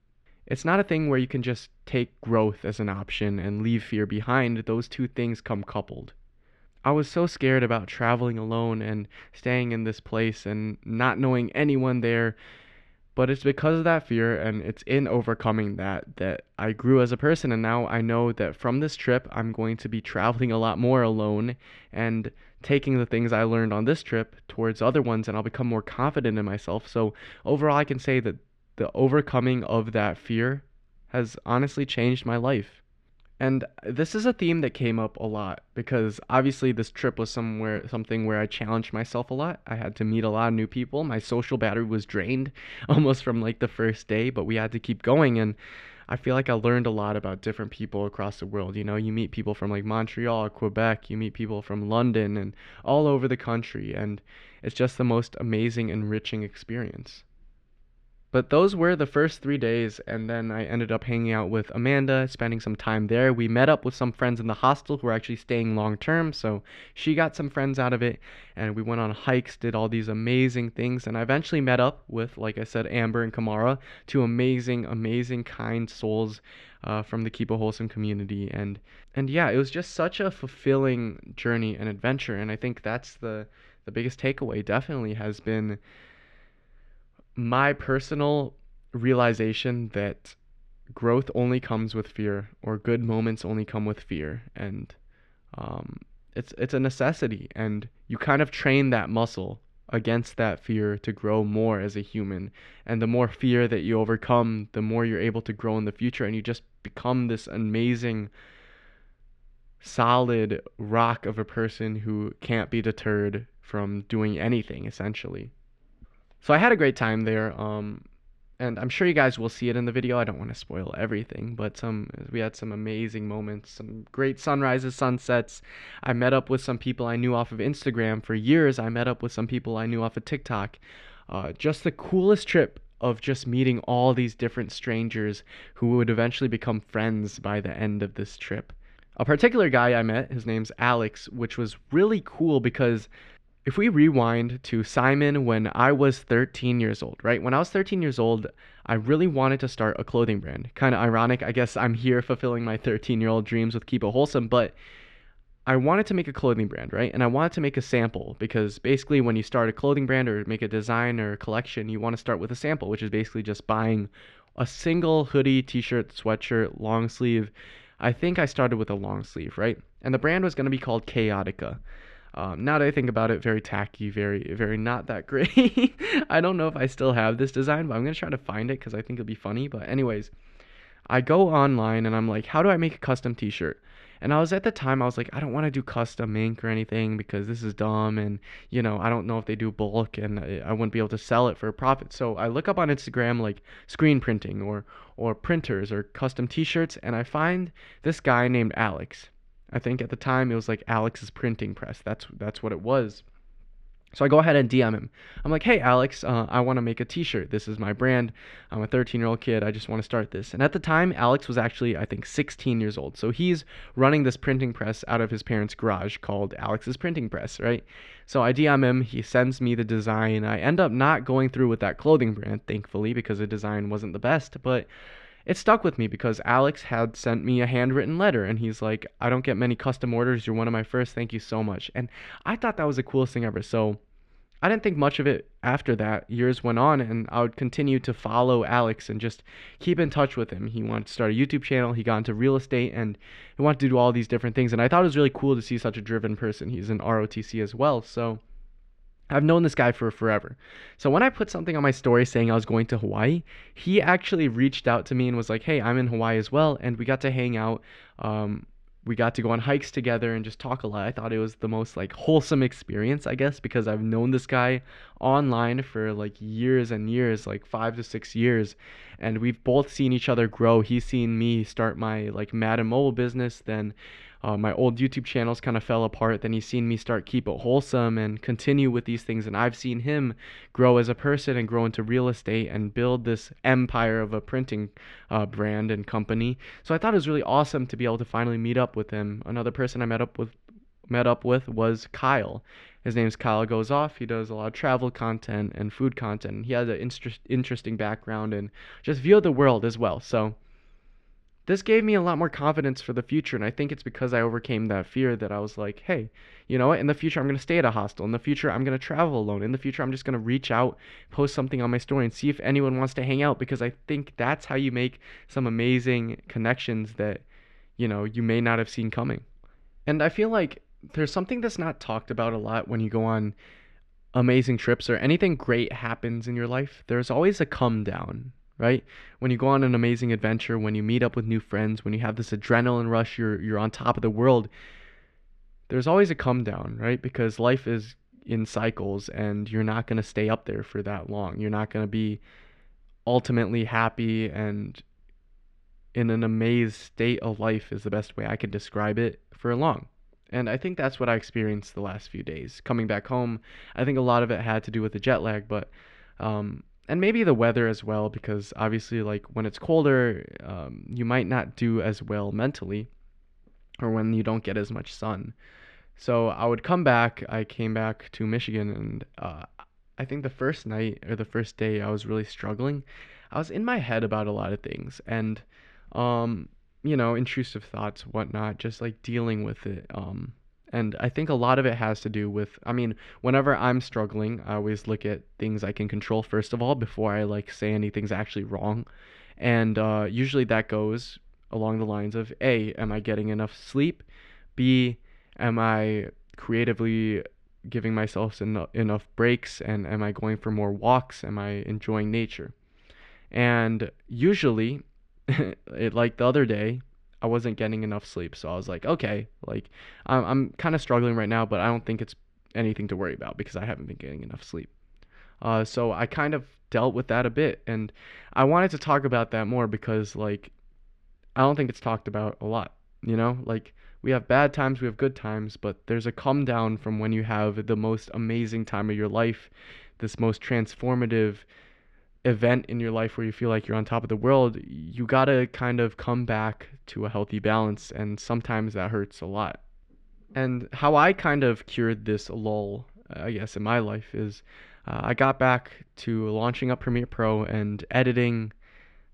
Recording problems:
muffled; slightly; fading above 2.5 kHz

